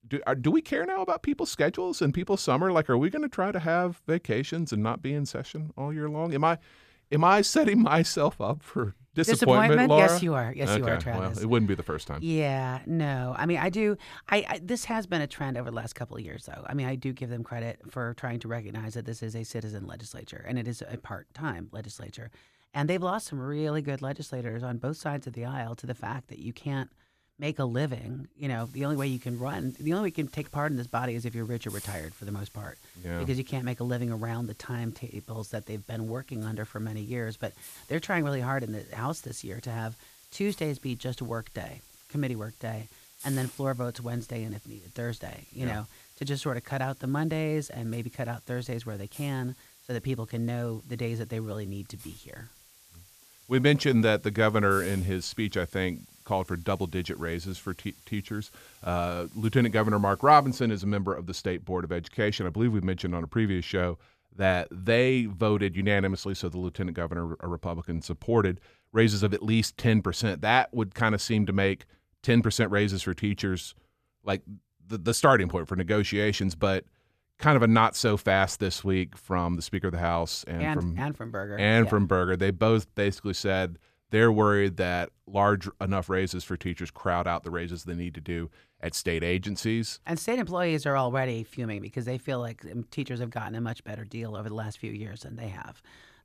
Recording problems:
hiss; faint; from 29 s to 1:01; 20 dB below the speech

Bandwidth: 14.5 kHz